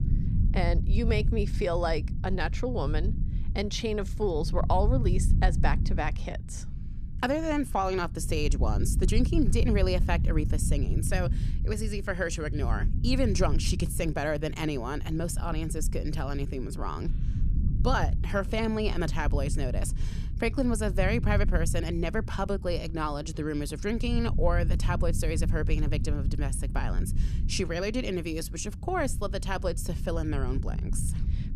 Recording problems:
low rumble; noticeable; throughout; 15 dB below the speech

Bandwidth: 14.5 kHz